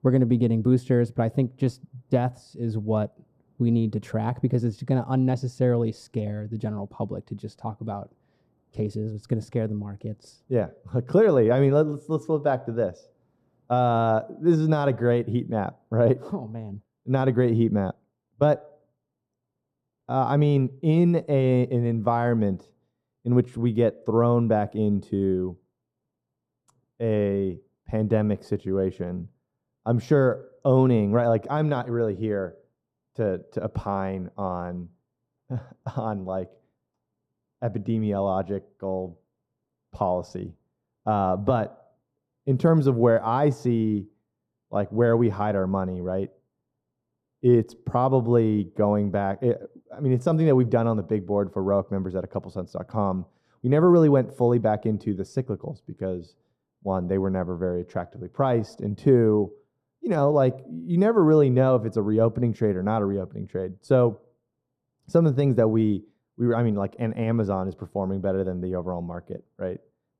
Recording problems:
muffled; very; fading above 1.5 kHz

